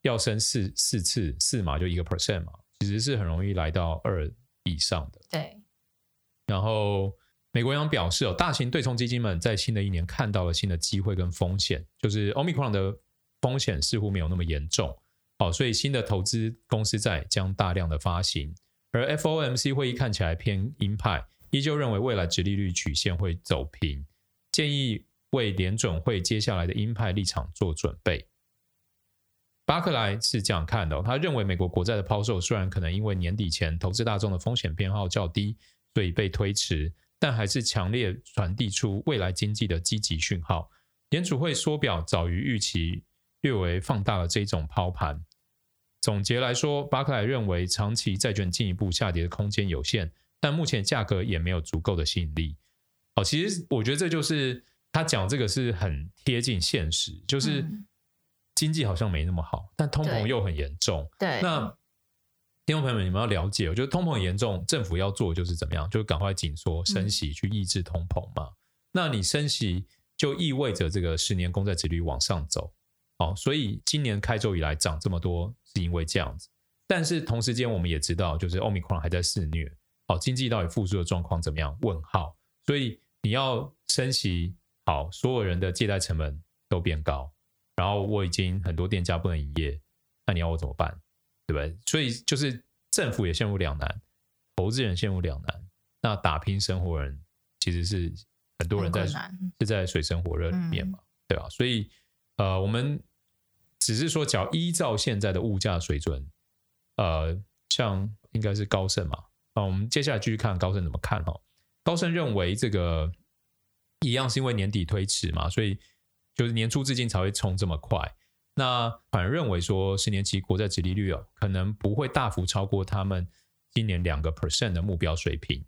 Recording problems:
squashed, flat; somewhat

